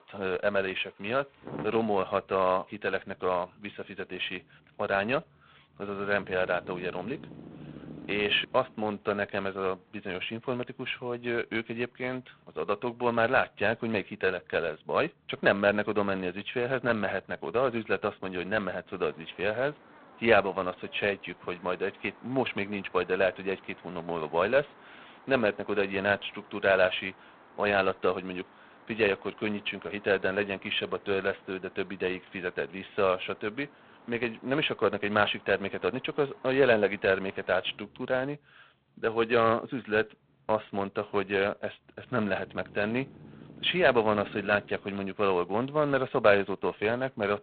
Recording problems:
phone-call audio; poor line; nothing above 3.5 kHz
traffic noise; faint; throughout; 20 dB below the speech

